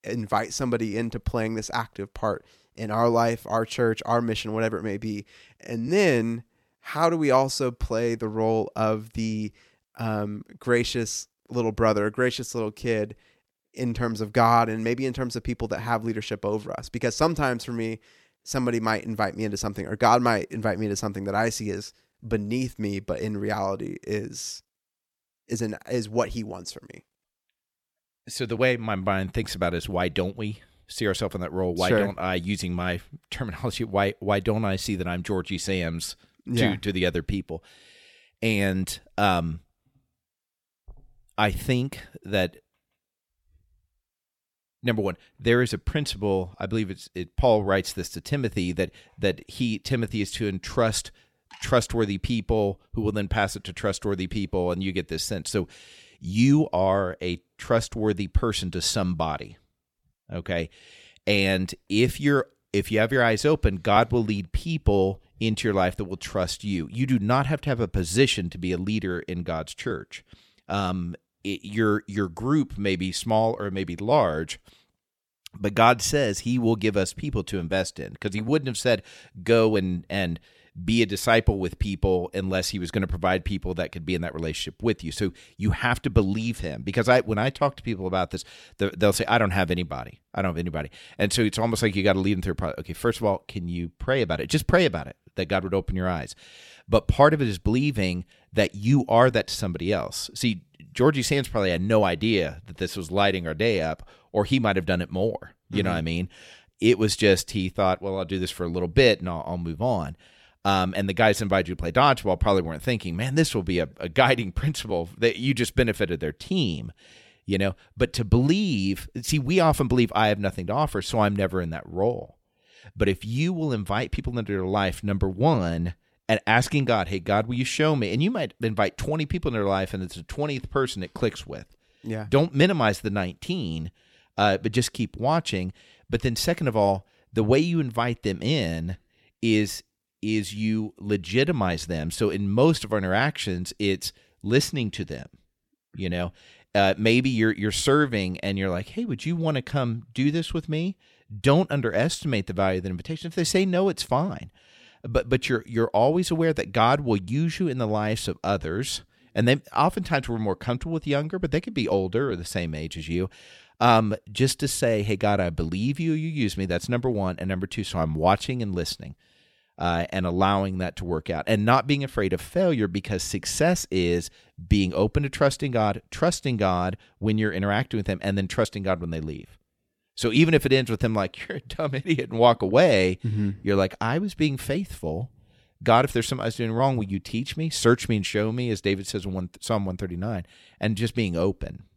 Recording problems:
none

